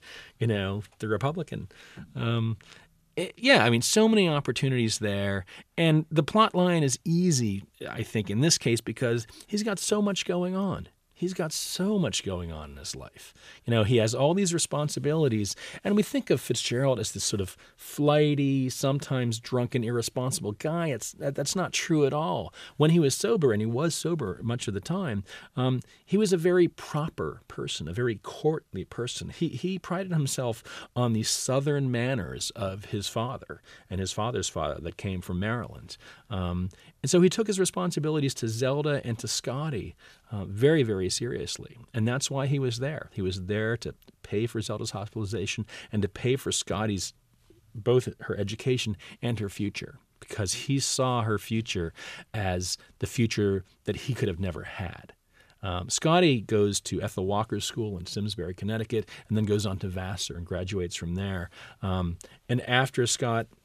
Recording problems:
none

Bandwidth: 14.5 kHz